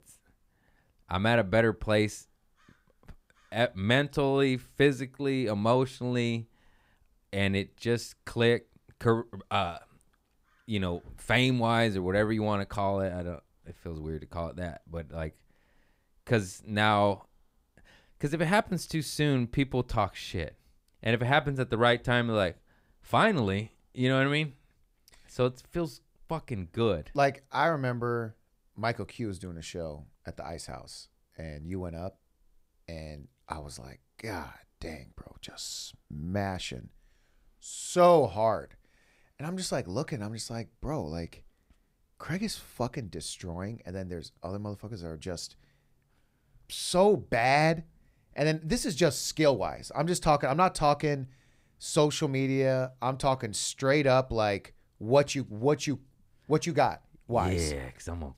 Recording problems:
none

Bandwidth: 15.5 kHz